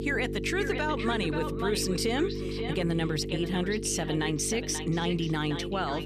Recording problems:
echo of what is said; strong; throughout; 530 ms later, 9 dB below the speech
electrical hum; loud; throughout; 50 Hz, 8 dB below the speech

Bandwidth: 14.5 kHz